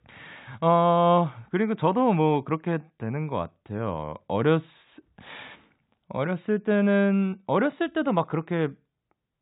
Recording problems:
high frequencies cut off; severe; nothing above 4 kHz

